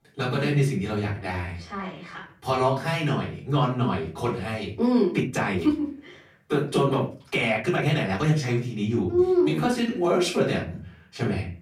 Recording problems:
off-mic speech; far
room echo; slight; dies away in 0.4 s
uneven, jittery; strongly; from 1 to 10 s

